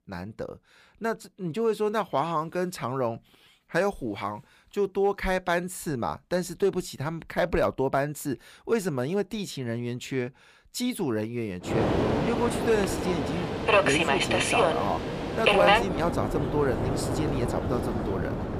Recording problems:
train or aircraft noise; very loud; from 12 s on; 3 dB above the speech

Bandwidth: 15 kHz